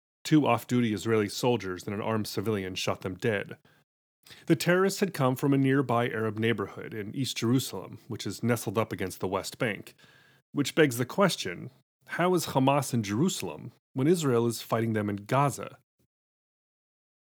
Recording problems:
none

